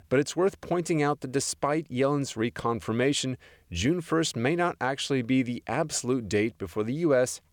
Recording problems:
none

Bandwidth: 18.5 kHz